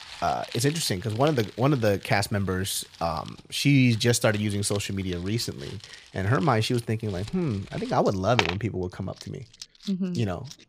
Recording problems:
household noises; noticeable; throughout; 15 dB below the speech

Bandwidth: 14.5 kHz